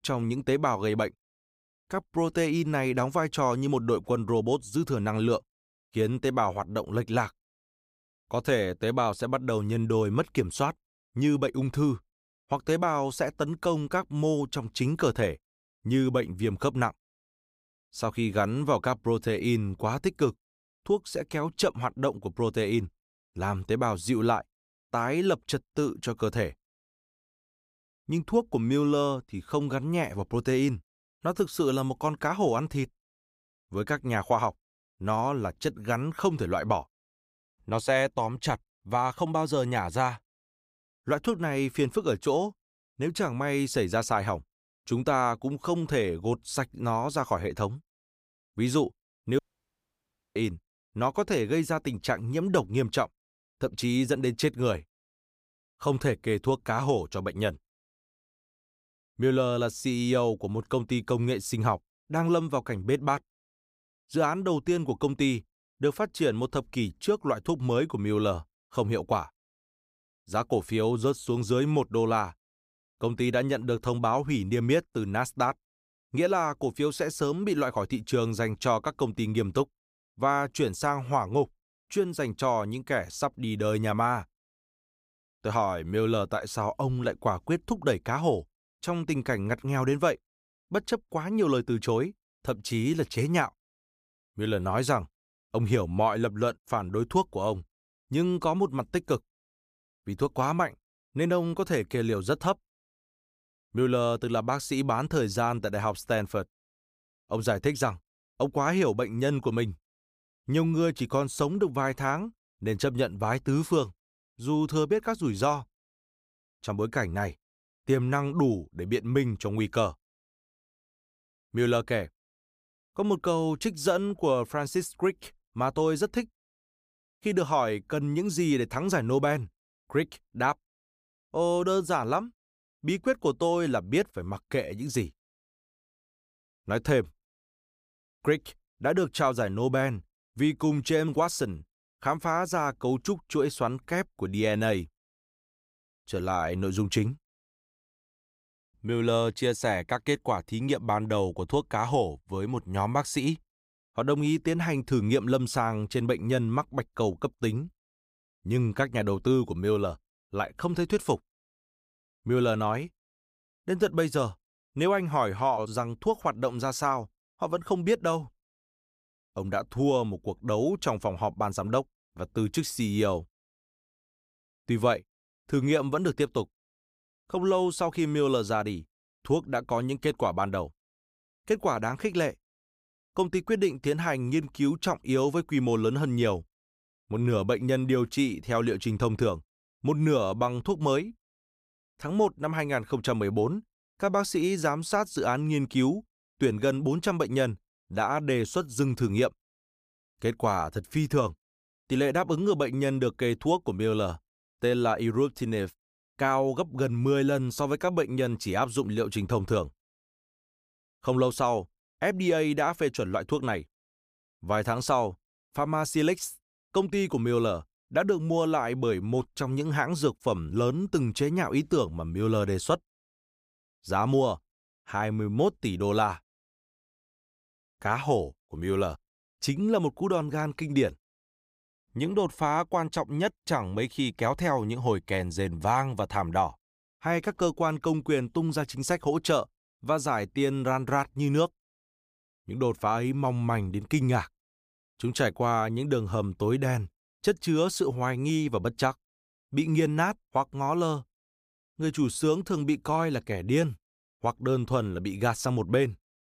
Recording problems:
audio cutting out; at 49 s for 1 s

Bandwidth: 15 kHz